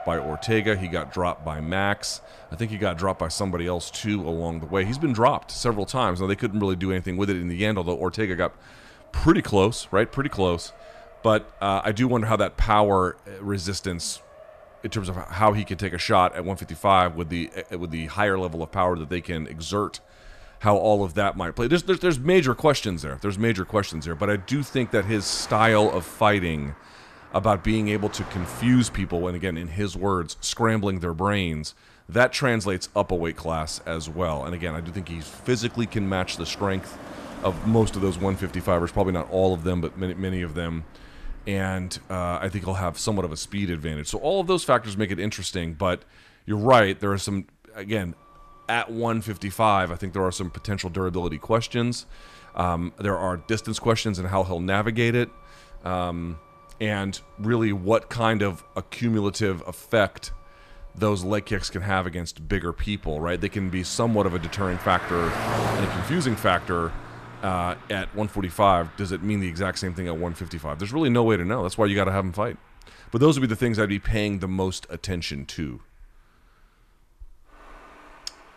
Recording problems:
traffic noise; noticeable; throughout; 15 dB below the speech

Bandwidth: 14 kHz